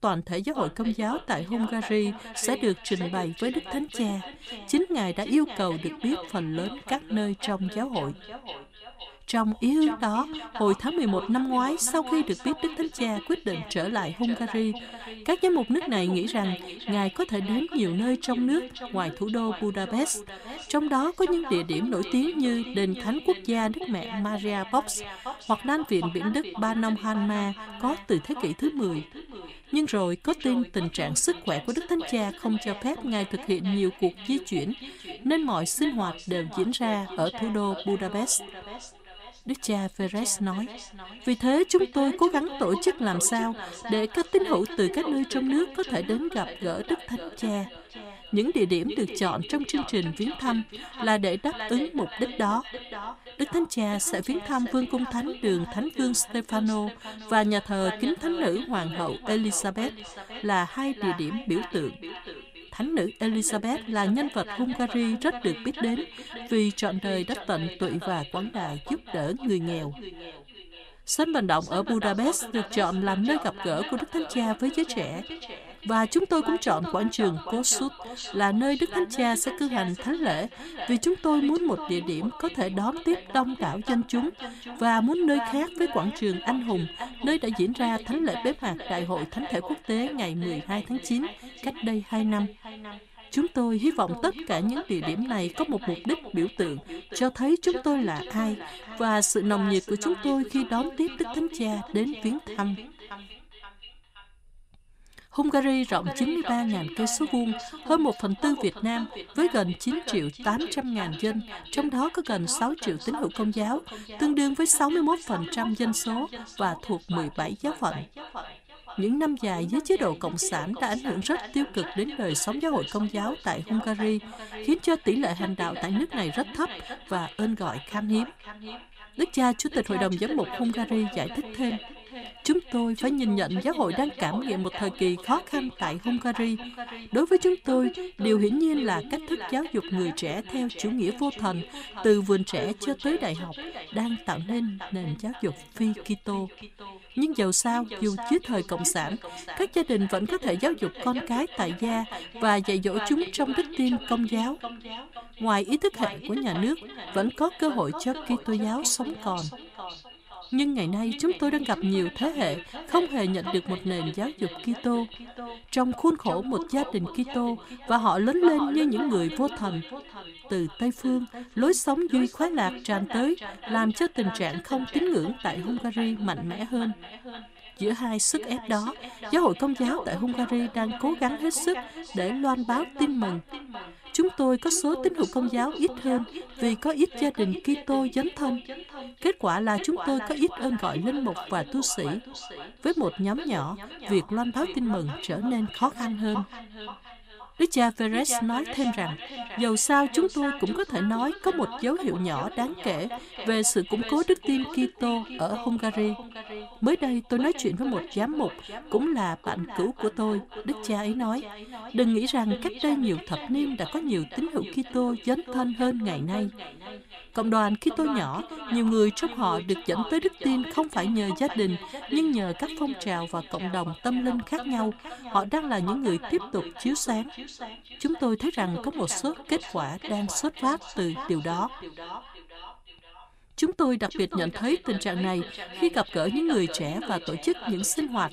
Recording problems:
echo of what is said; strong; throughout; 520 ms later, 10 dB below the speech

